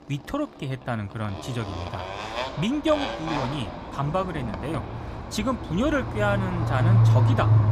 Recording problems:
traffic noise; very loud; throughout; 2 dB above the speech

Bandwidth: 15.5 kHz